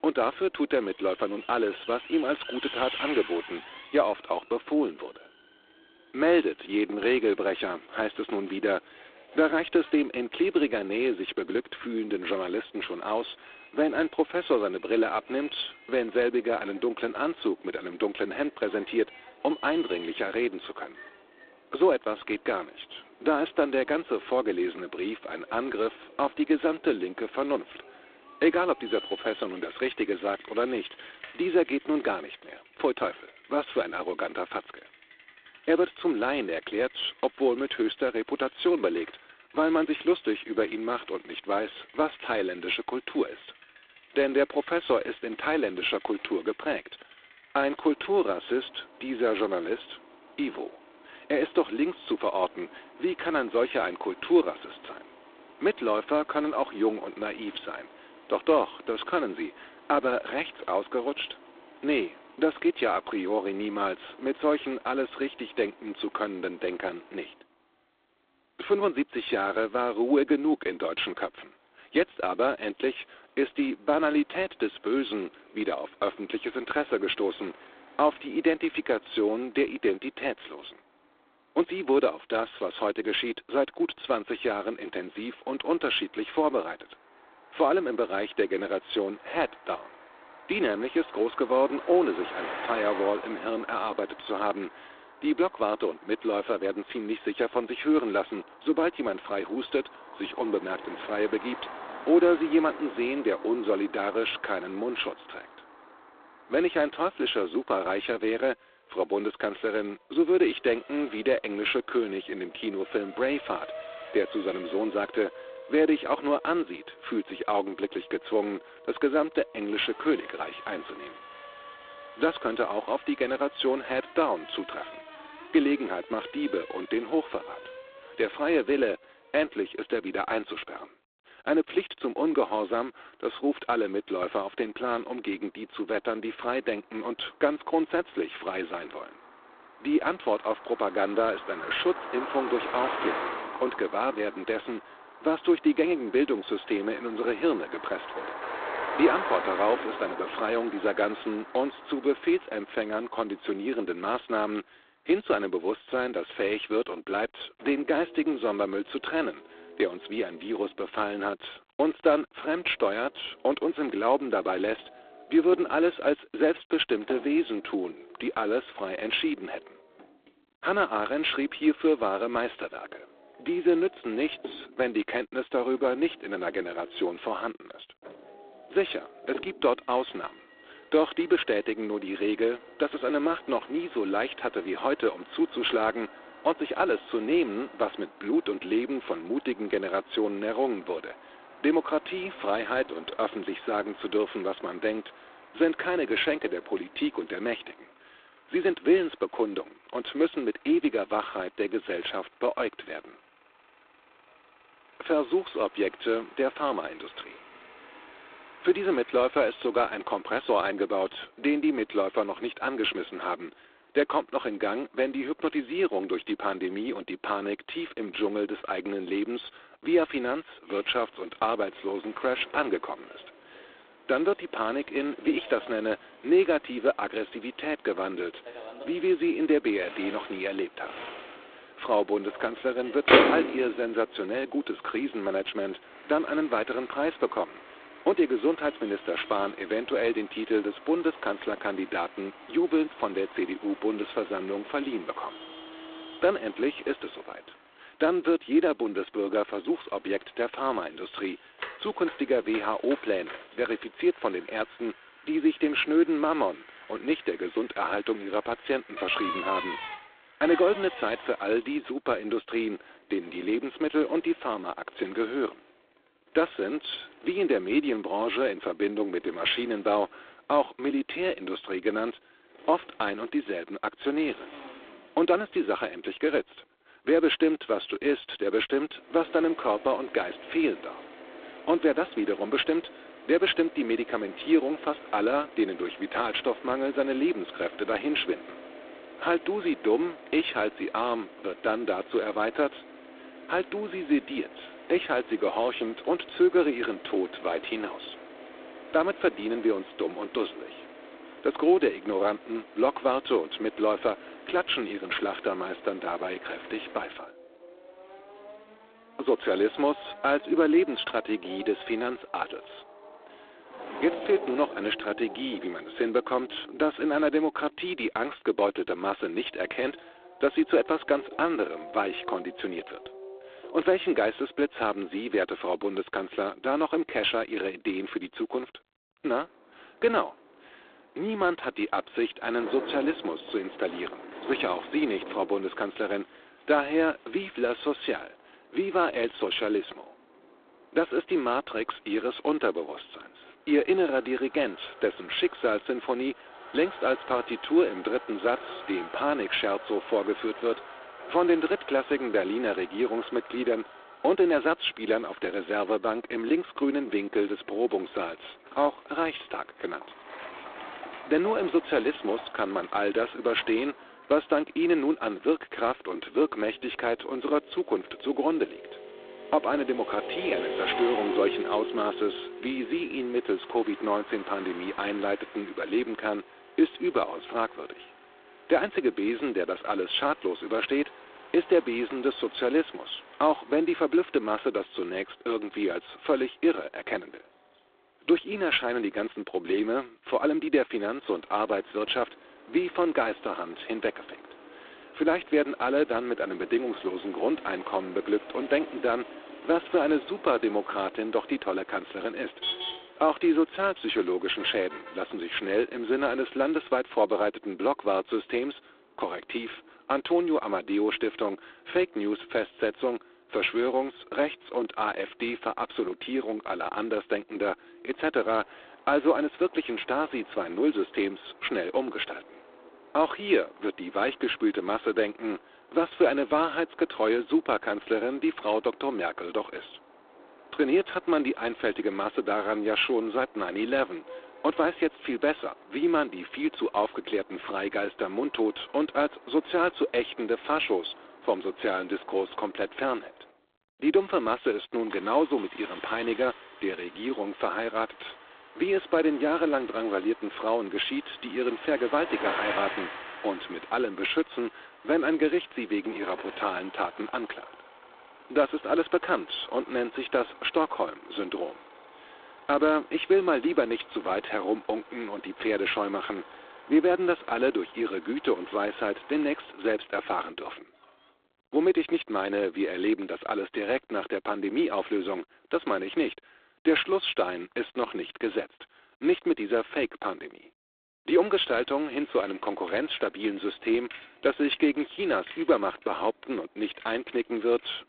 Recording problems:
phone-call audio; poor line; nothing above 3.5 kHz
traffic noise; noticeable; throughout; 15 dB below the speech

